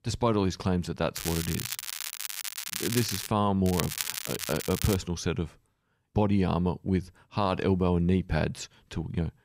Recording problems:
crackling; loud; from 1 to 3.5 s and from 3.5 to 5 s; 5 dB below the speech

